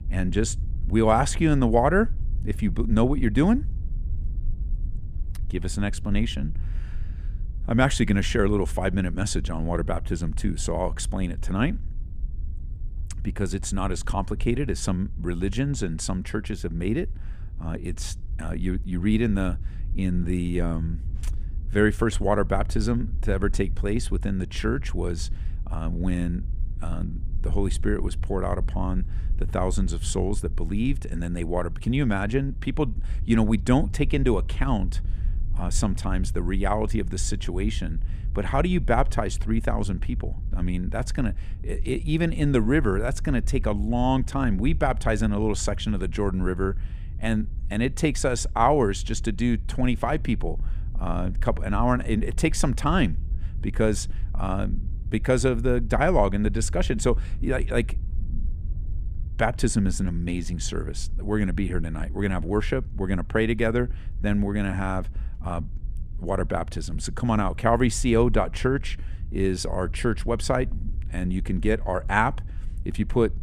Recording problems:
low rumble; faint; throughout; 25 dB below the speech

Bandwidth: 15 kHz